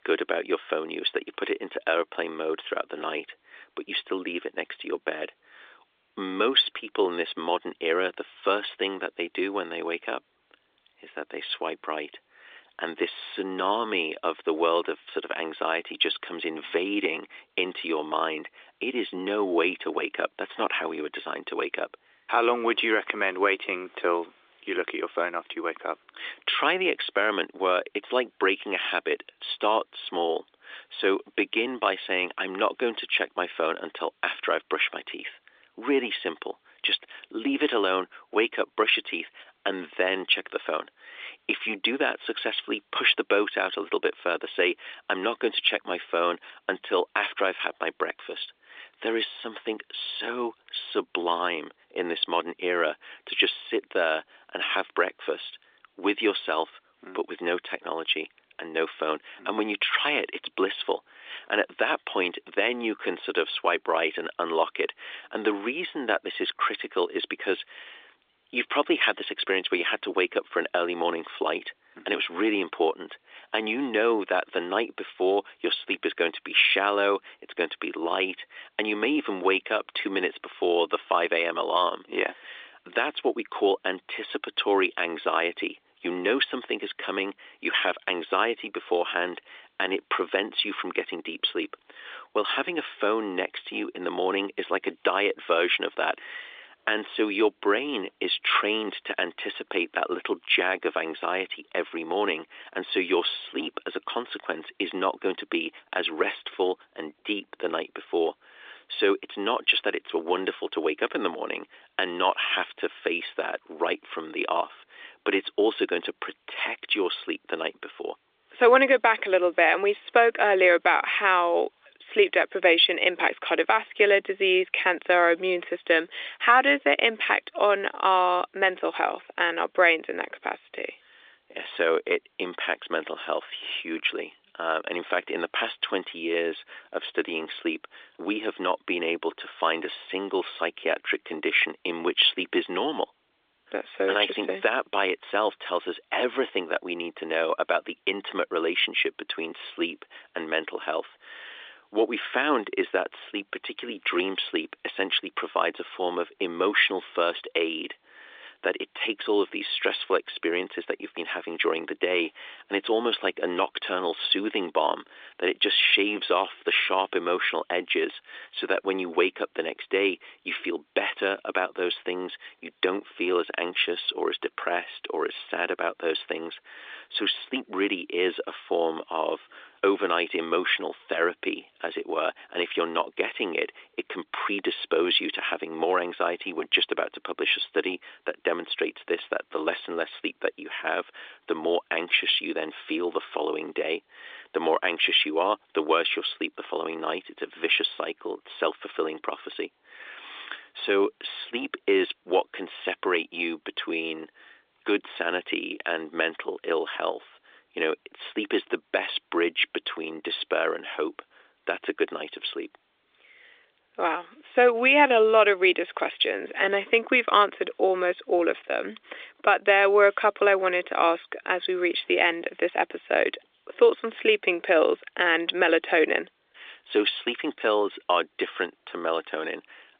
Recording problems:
phone-call audio

